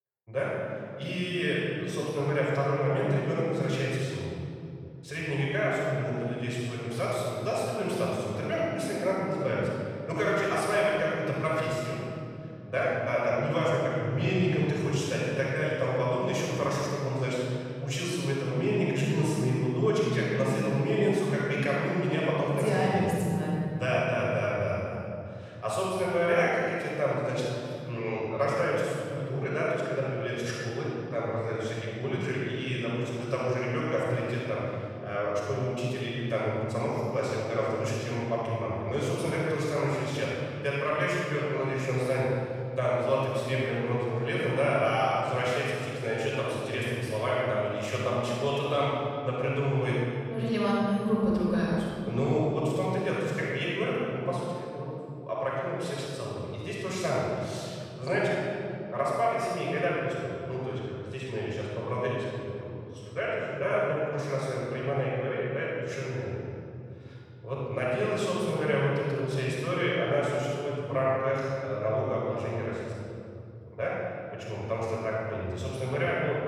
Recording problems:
room echo; strong; dies away in 3 s
off-mic speech; far

